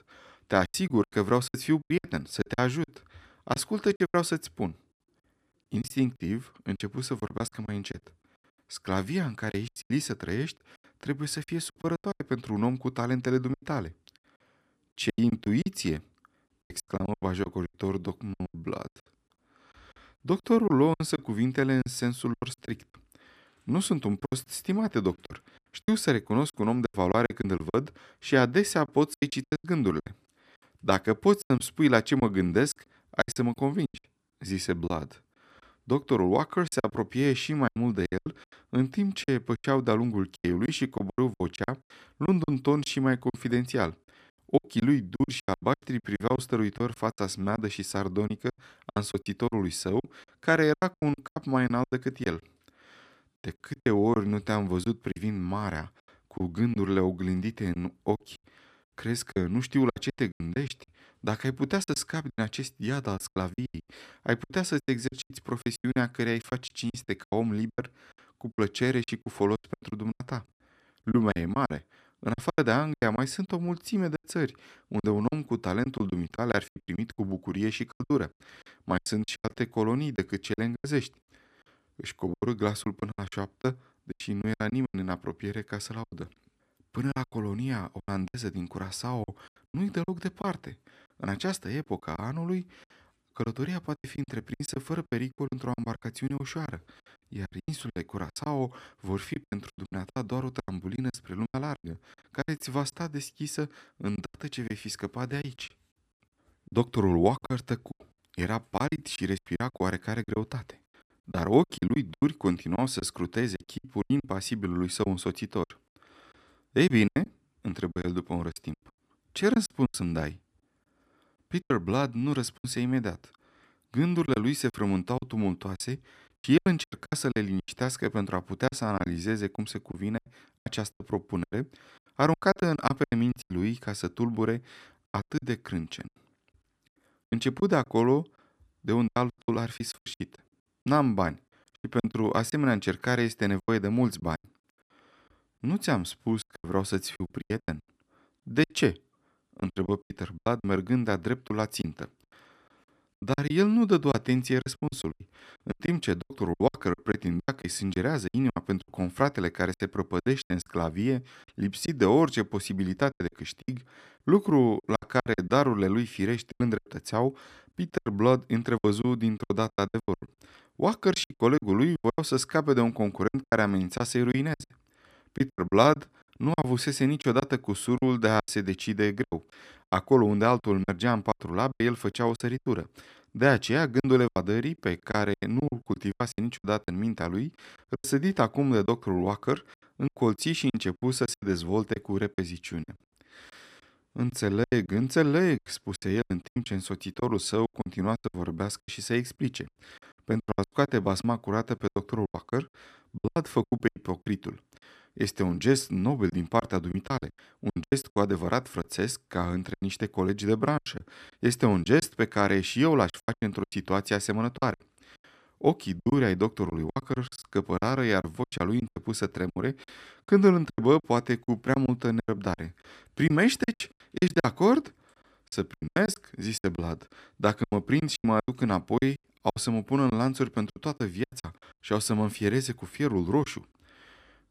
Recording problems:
choppy; very; 15% of the speech affected

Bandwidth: 14.5 kHz